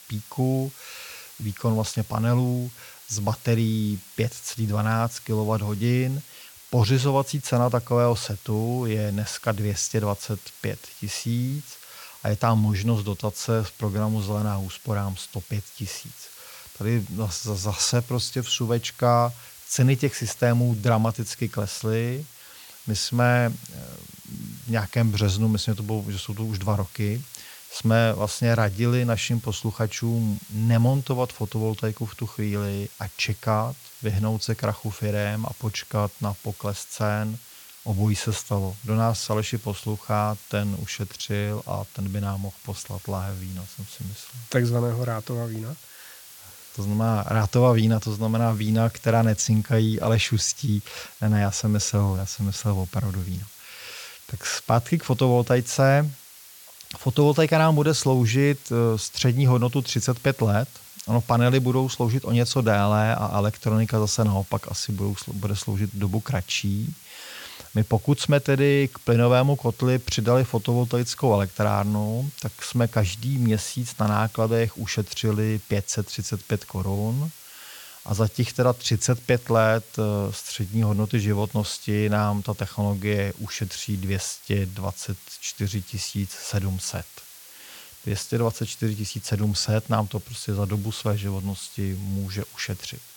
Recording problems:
hiss; noticeable; throughout; 20 dB below the speech

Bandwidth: 17.5 kHz